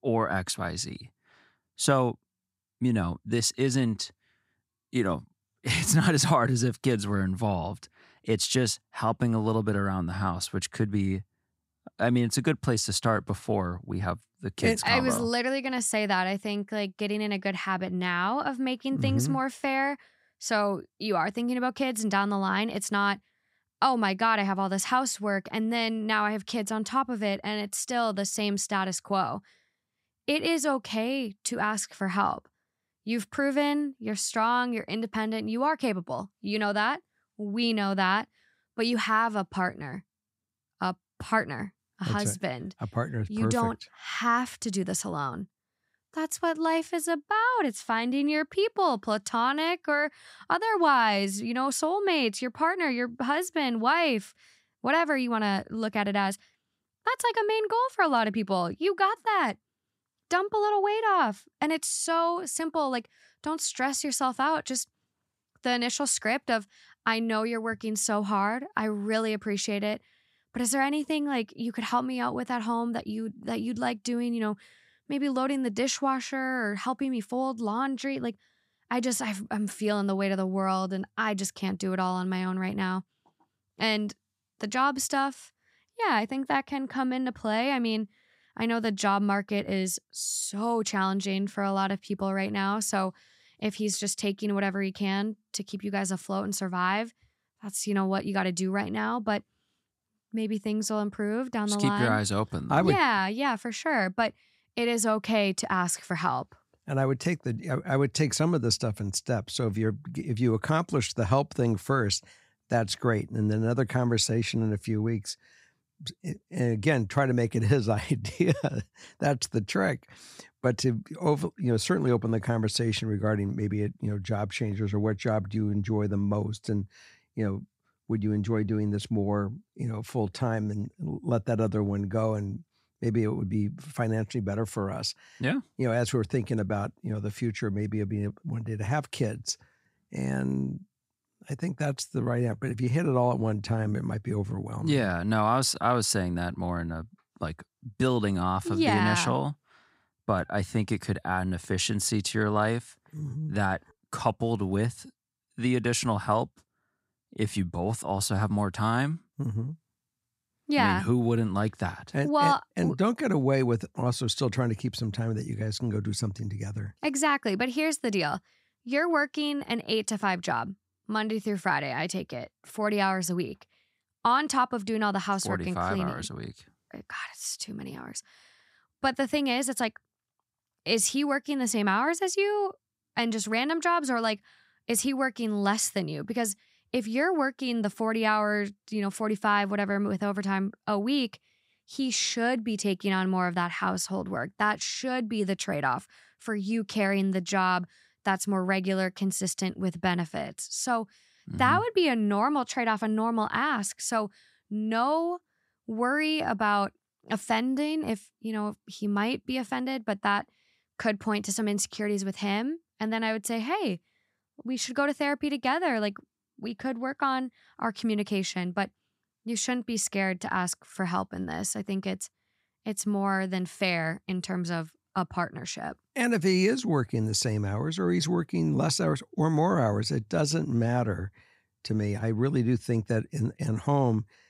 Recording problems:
none

